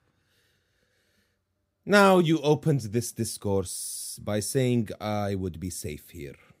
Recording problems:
none

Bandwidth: 15.5 kHz